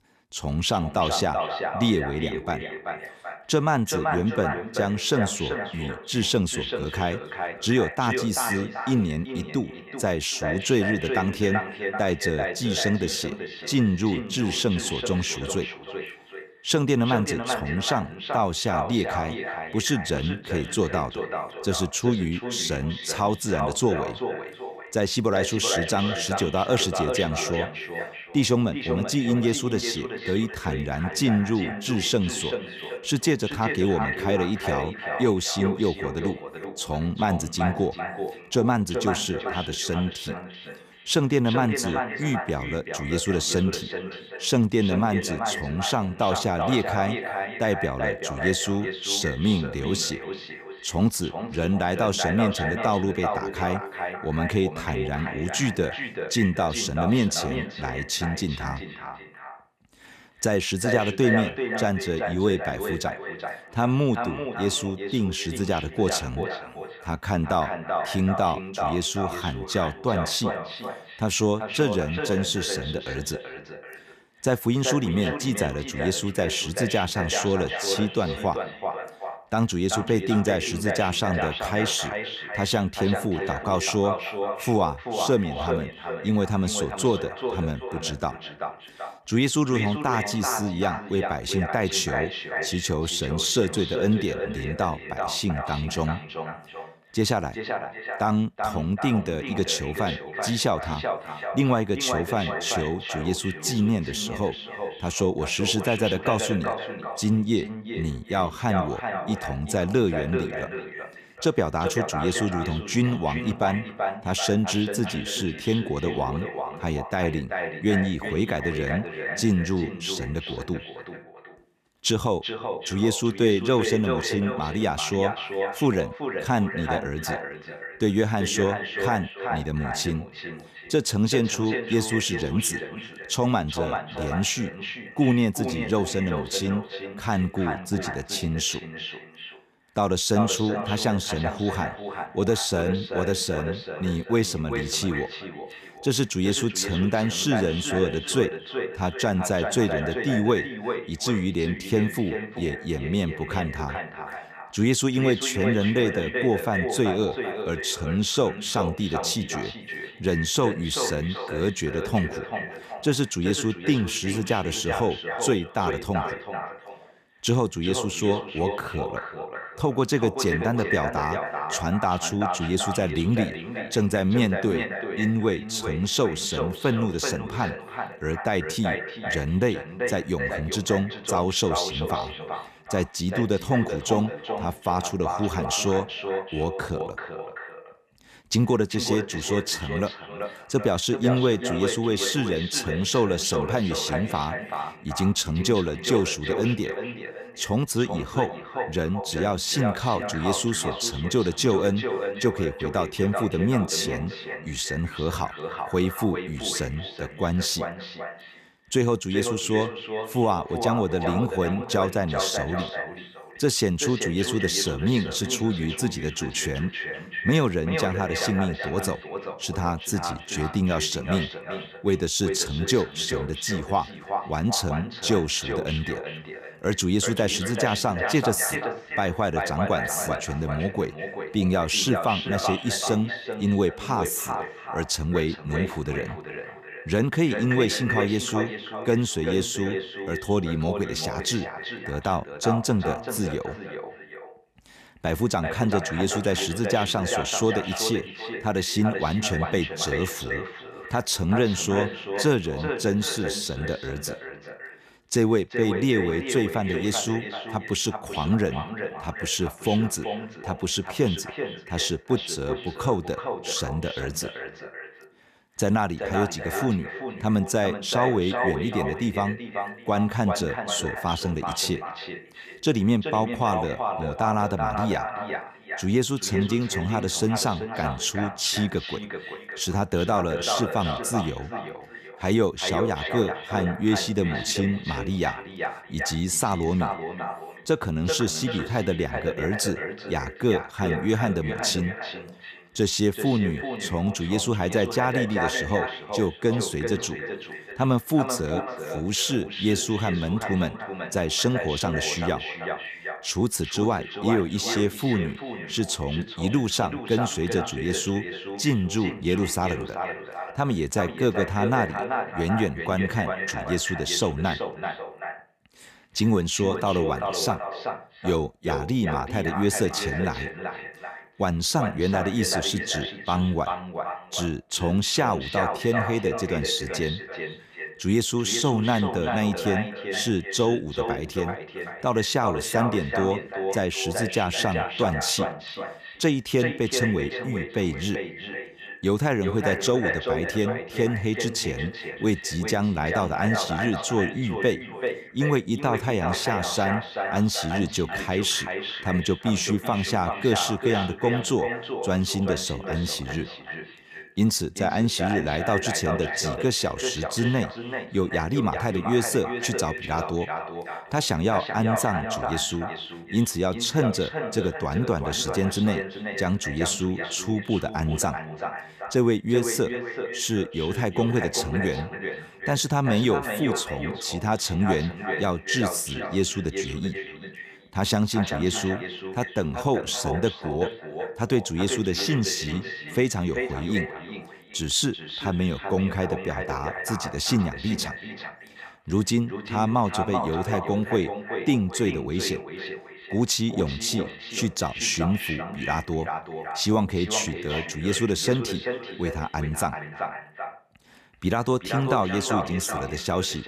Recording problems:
echo of what is said; strong; throughout; 380 ms later, 6 dB below the speech

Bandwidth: 14.5 kHz